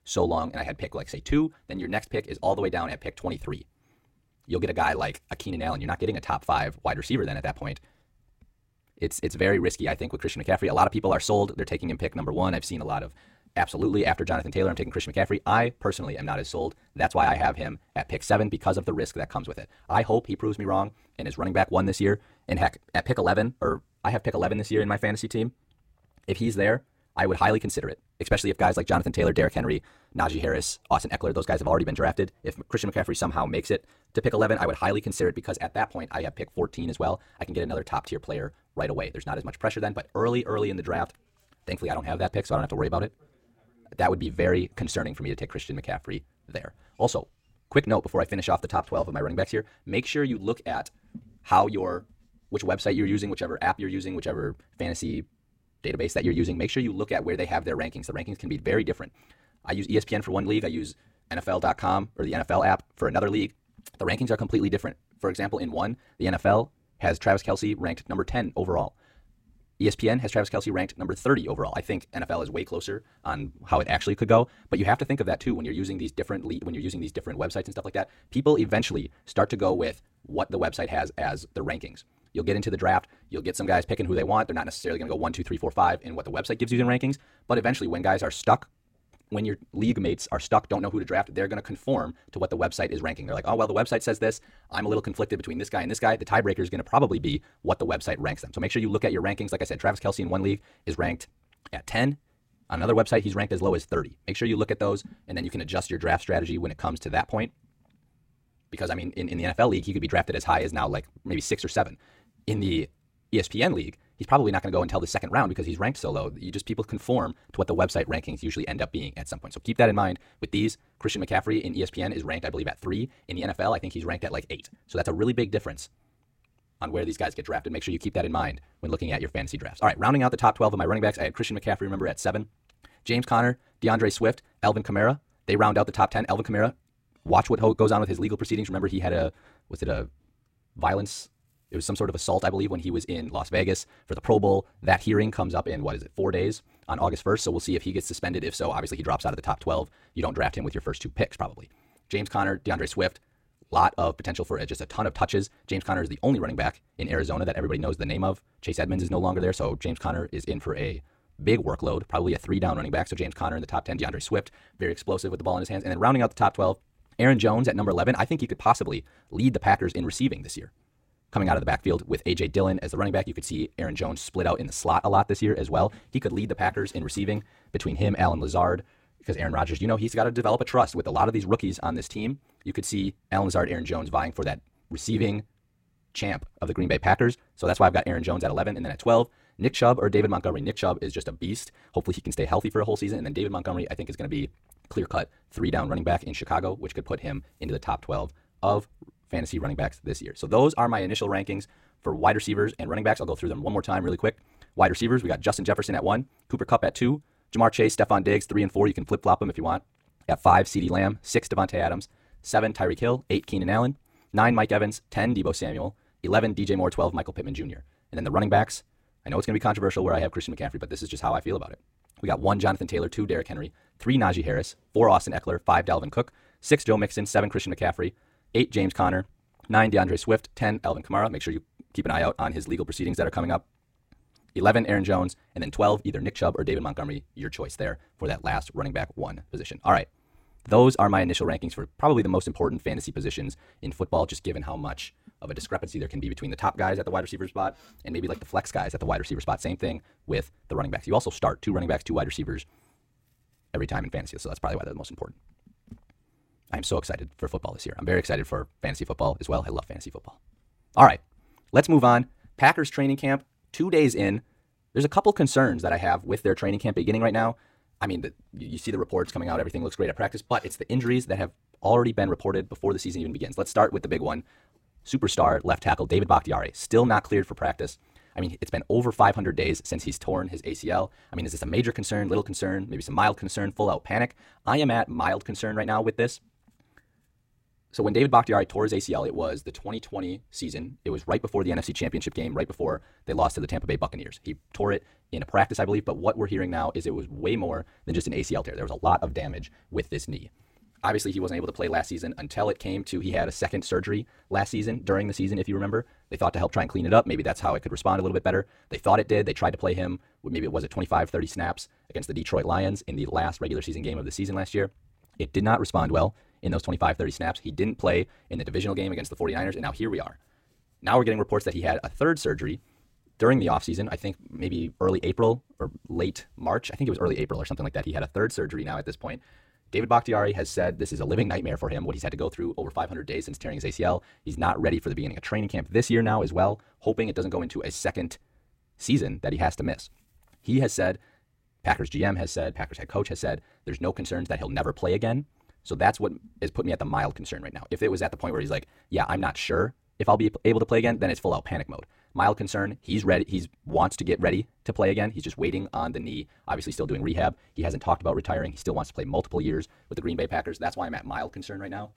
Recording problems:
wrong speed, natural pitch; too fast; 1.5 times normal speed

